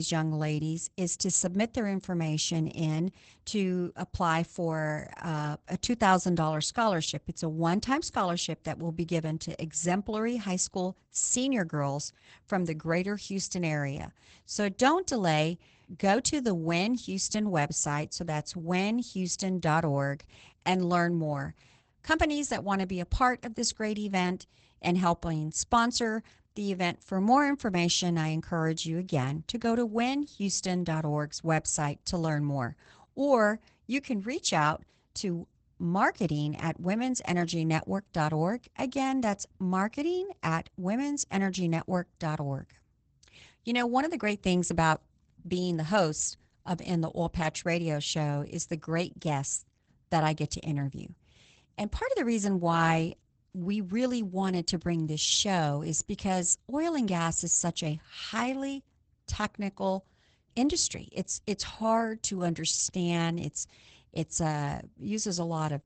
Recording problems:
garbled, watery; badly; nothing above 8 kHz
abrupt cut into speech; at the start

